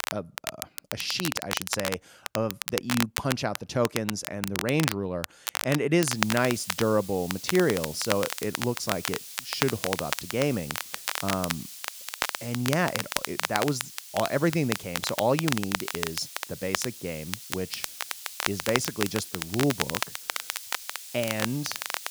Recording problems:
crackle, like an old record; loud; 3 dB below the speech
hiss; noticeable; from 6 s on; 10 dB below the speech

